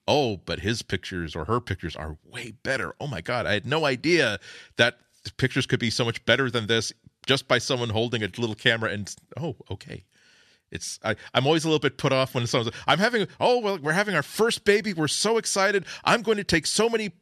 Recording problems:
none

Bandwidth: 13.5 kHz